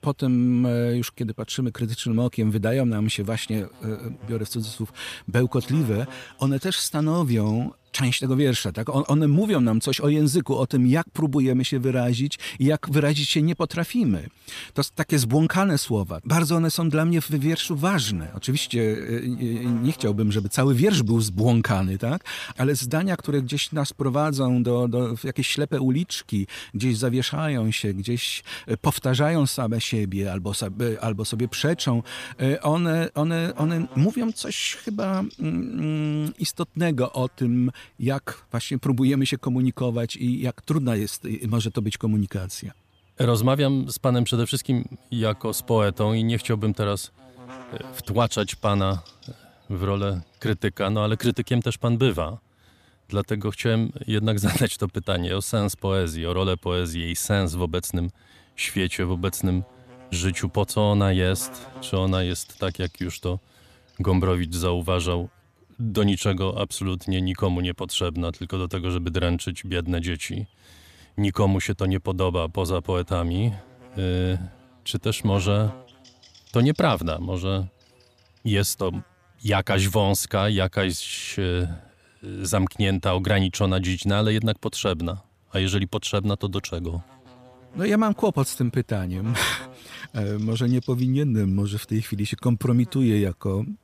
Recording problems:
electrical hum; faint; throughout; 60 Hz, 25 dB below the speech

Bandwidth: 14.5 kHz